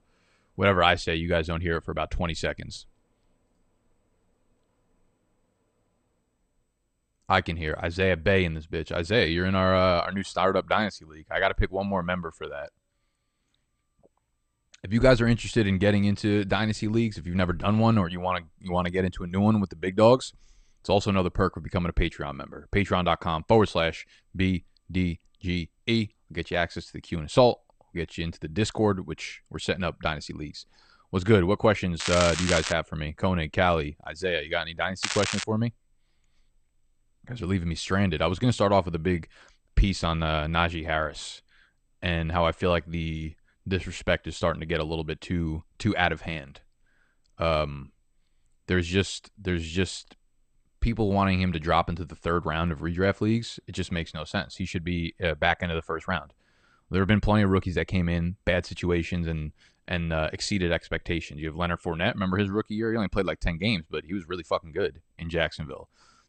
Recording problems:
garbled, watery; slightly; nothing above 8.5 kHz
crackling; loud; at 32 s and at 35 s; 3 dB below the speech

